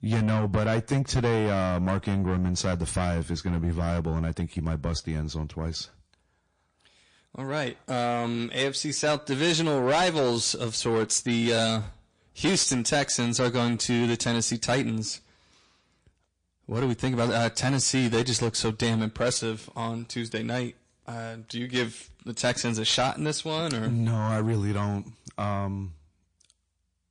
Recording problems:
distortion; heavy; 7 dB below the speech
garbled, watery; slightly; nothing above 8.5 kHz

